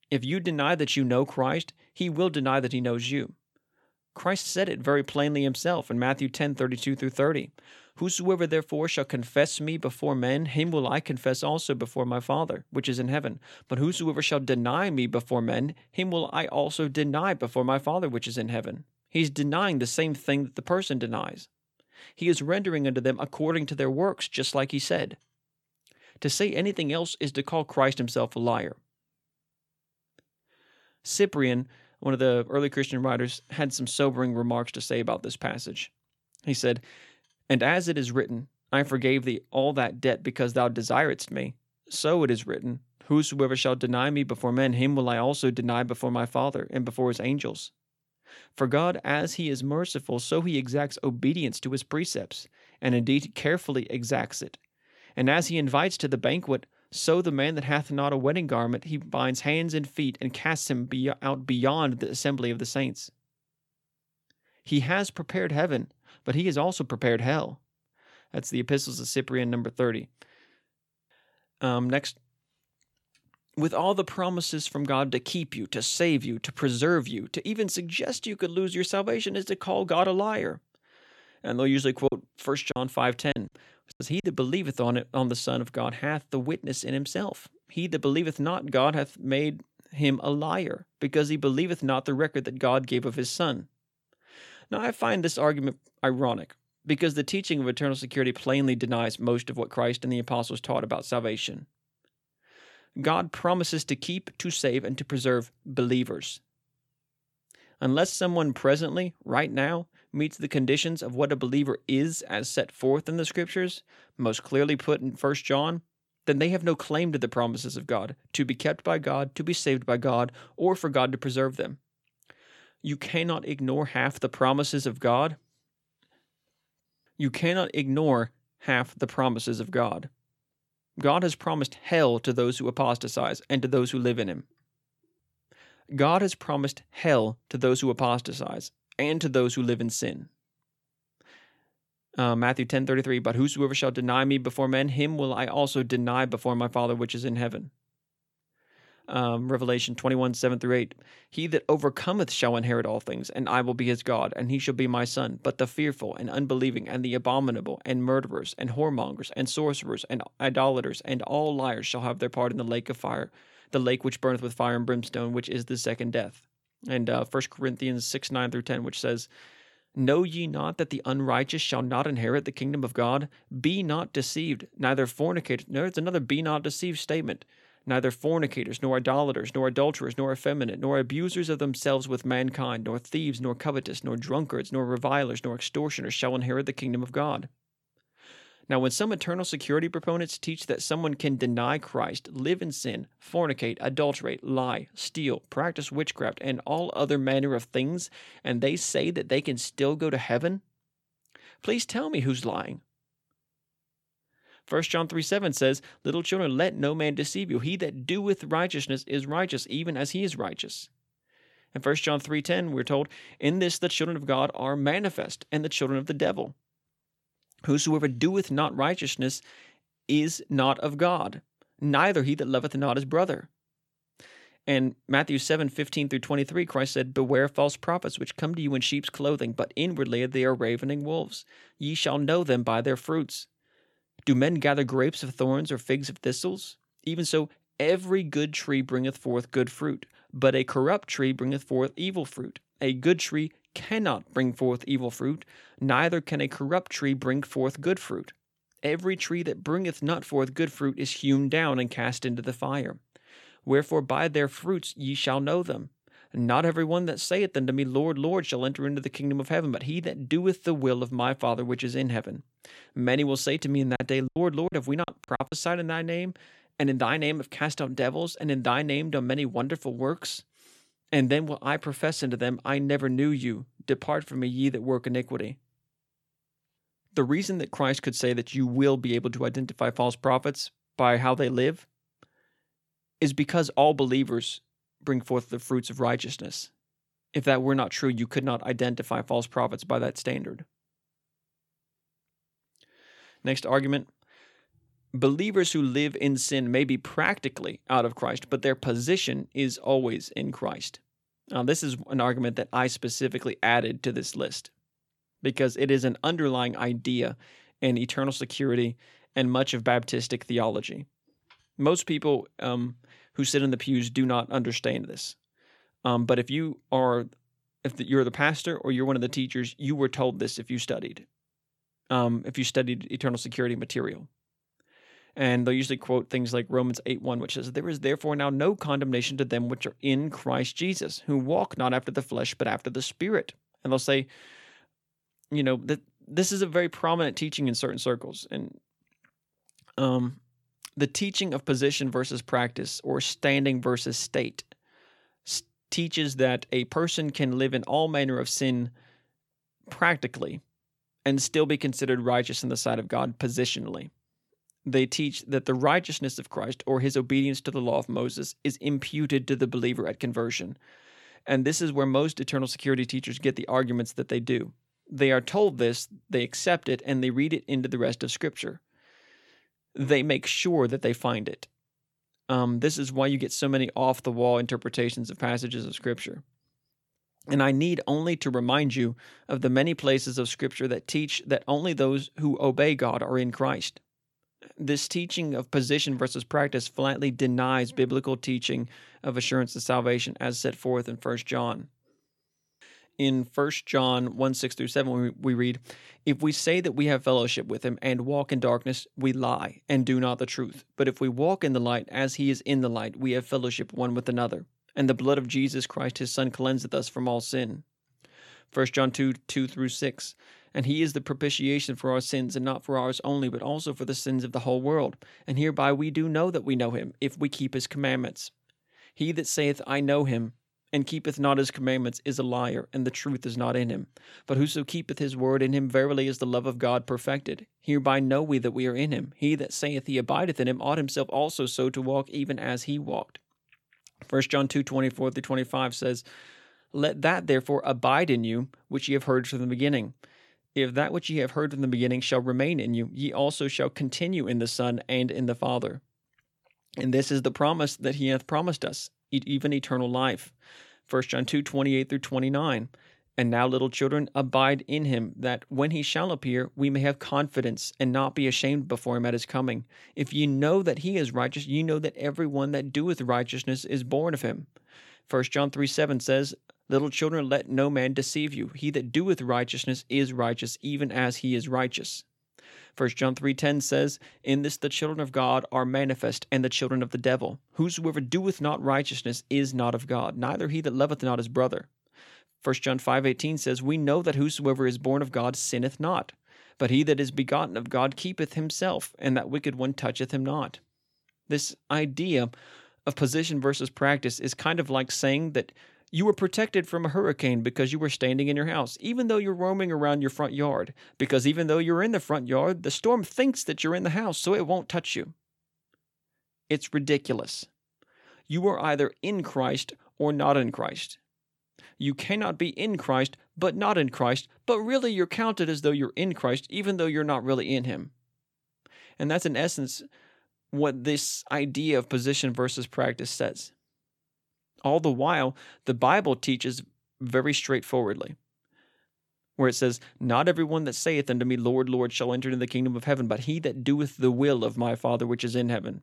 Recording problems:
choppy; very; from 1:22 to 1:24 and from 4:24 to 4:26; 18% of the speech affected

